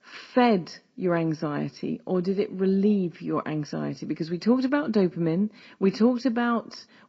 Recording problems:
garbled, watery; slightly; nothing above 7.5 kHz

